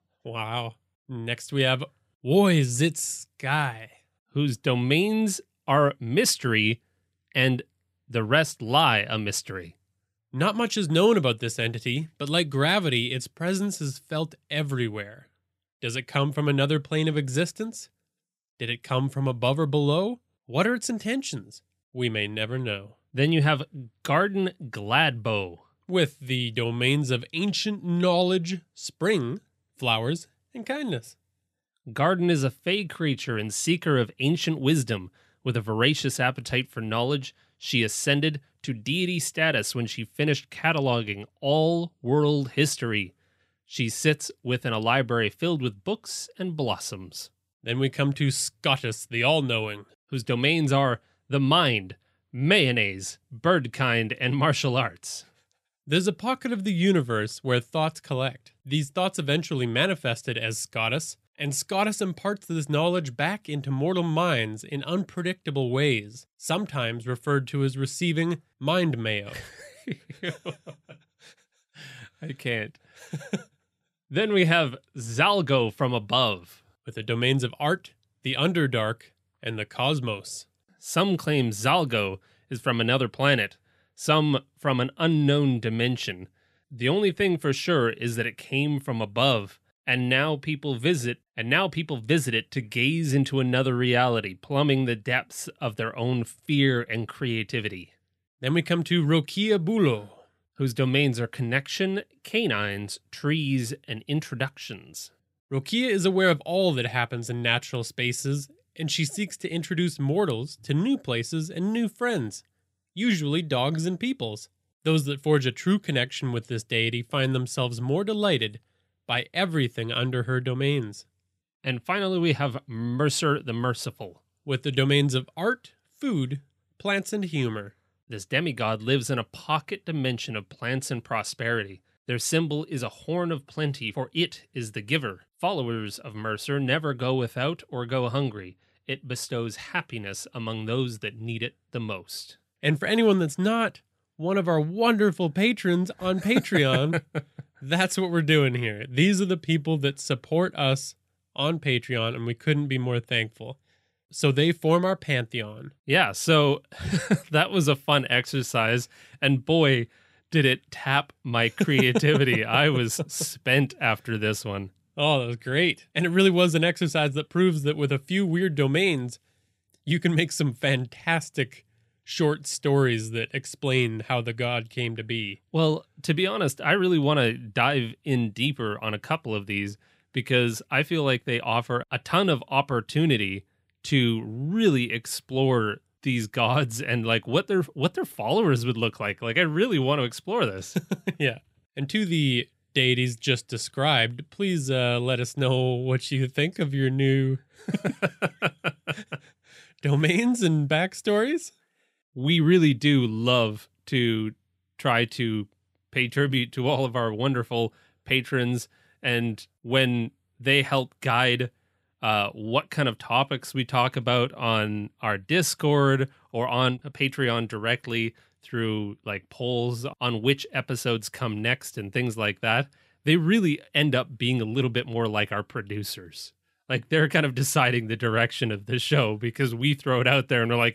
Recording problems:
none

